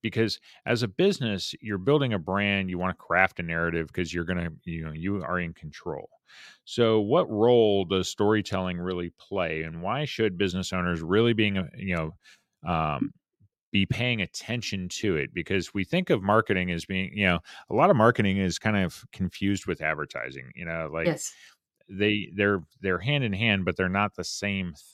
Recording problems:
none

